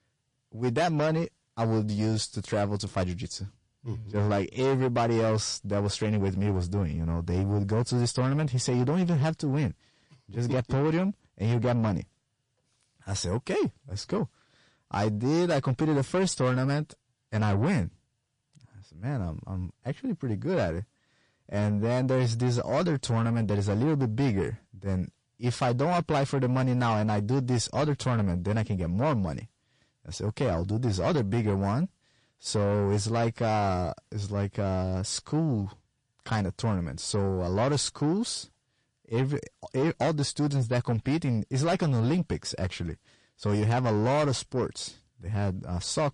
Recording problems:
distortion; slight; 10 dB below the speech
garbled, watery; slightly; nothing above 9 kHz

